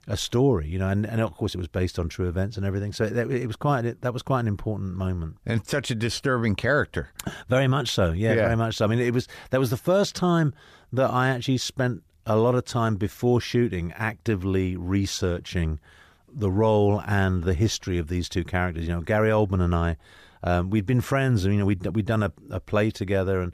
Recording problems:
none

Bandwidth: 14.5 kHz